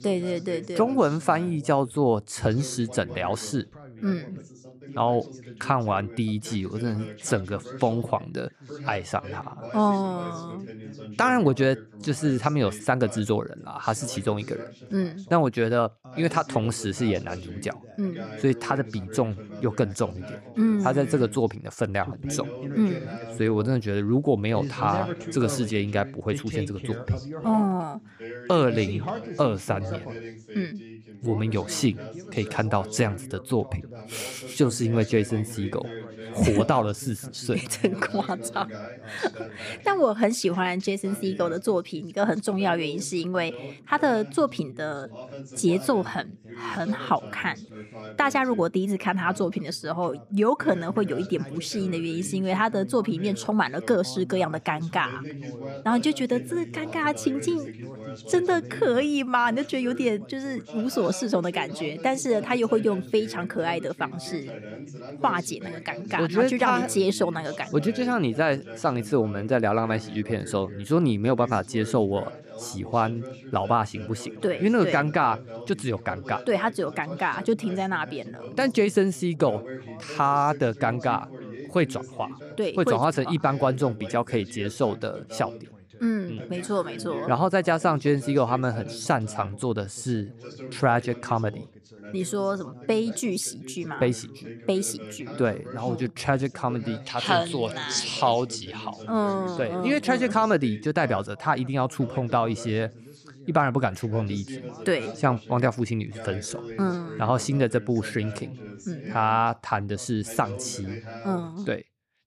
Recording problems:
background chatter; noticeable; throughout; 2 voices, 15 dB below the speech

